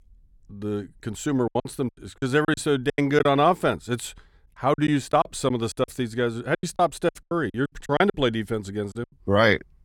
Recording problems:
choppy; very; from 1.5 to 3.5 s, from 4.5 to 6 s and from 6.5 to 9 s; 20% of the speech affected

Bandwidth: 17.5 kHz